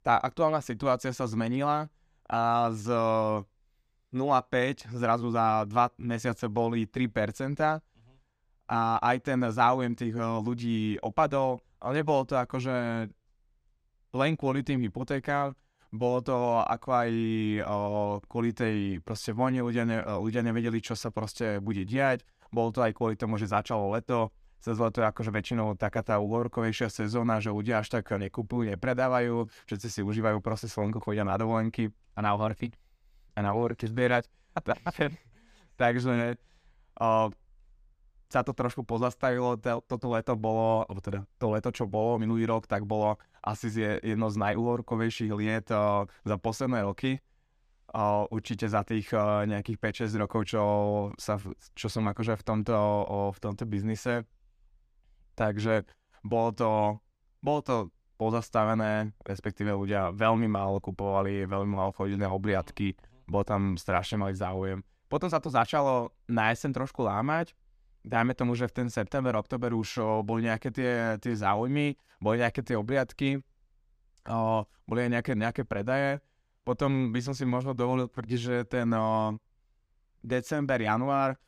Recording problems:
none

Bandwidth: 14.5 kHz